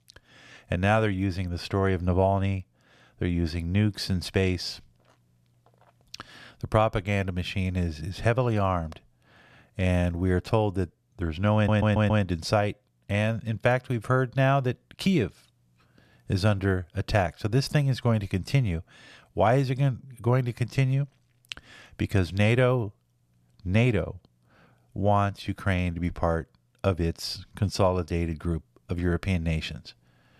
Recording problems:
audio stuttering; at 12 s

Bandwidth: 14.5 kHz